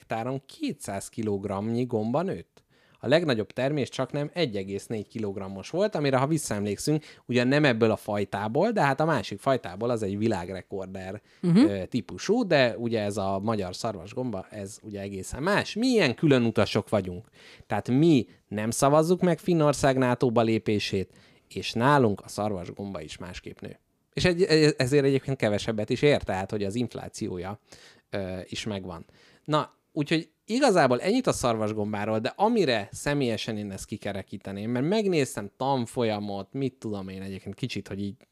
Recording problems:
none

